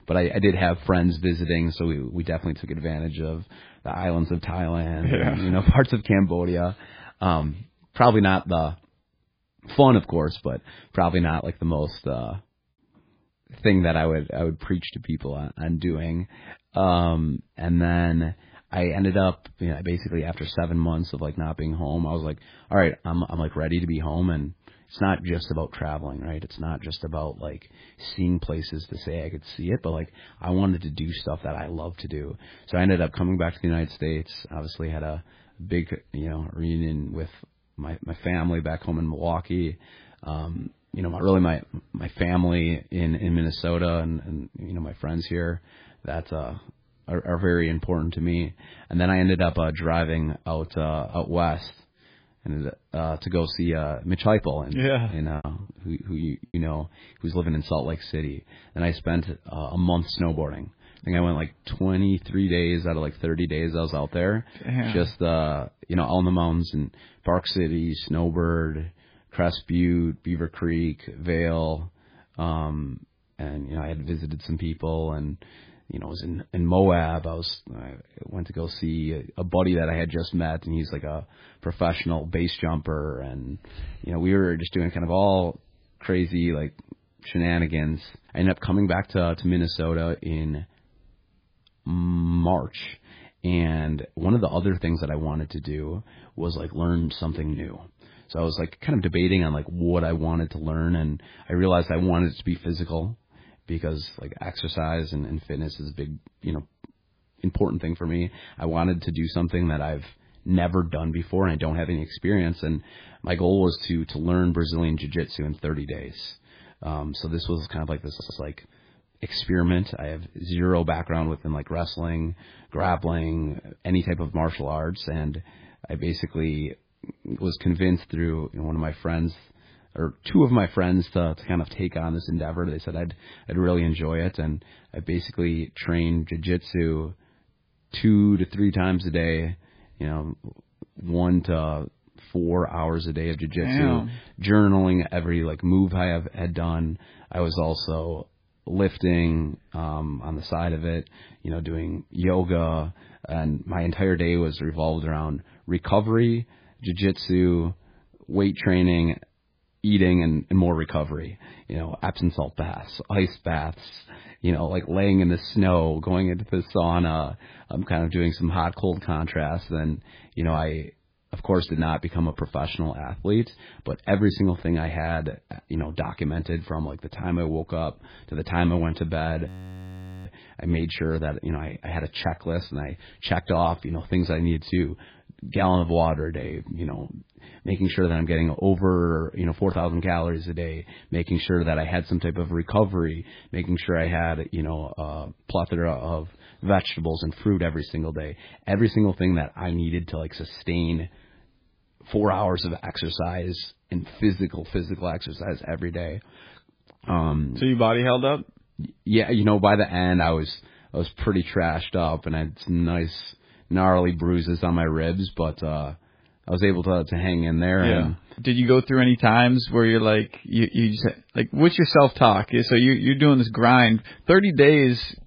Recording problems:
garbled, watery; badly; nothing above 5 kHz
choppy; occasionally; from 55 to 57 s; 3% of the speech affected
audio stuttering; at 1:58
audio freezing; at 2:59 for 1 s

